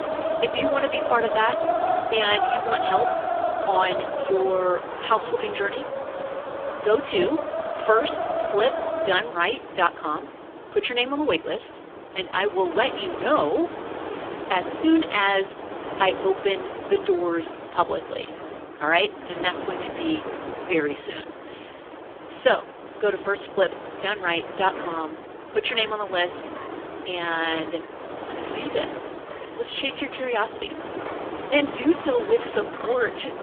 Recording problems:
phone-call audio; poor line; nothing above 3.5 kHz
wind in the background; loud; throughout; 6 dB below the speech

